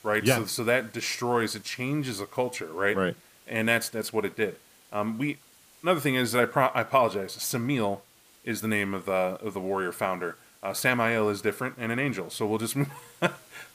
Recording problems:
hiss; faint; throughout; 25 dB below the speech

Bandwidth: 15 kHz